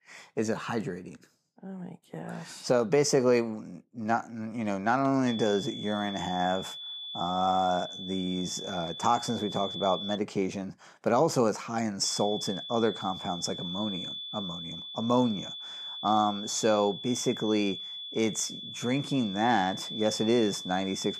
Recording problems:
high-pitched whine; loud; from 5.5 to 10 s and from 12 s on; 3.5 kHz, 8 dB below the speech

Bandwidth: 14.5 kHz